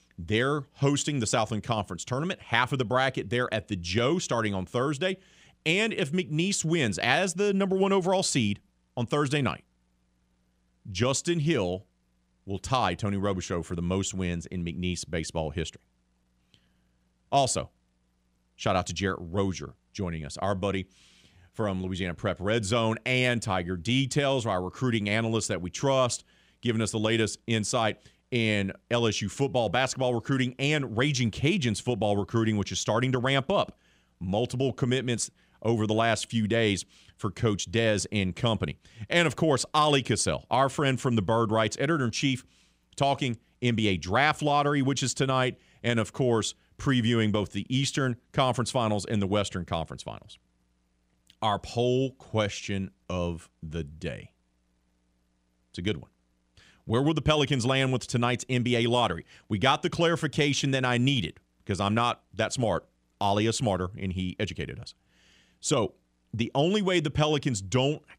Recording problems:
none

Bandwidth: 15.5 kHz